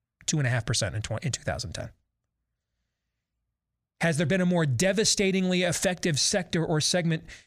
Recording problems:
none

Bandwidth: 15 kHz